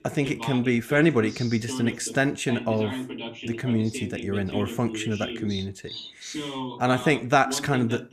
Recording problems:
voice in the background; loud; throughout; 10 dB below the speech

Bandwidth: 14.5 kHz